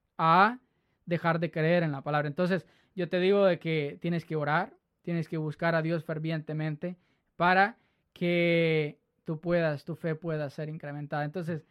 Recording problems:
muffled; slightly; fading above 3 kHz

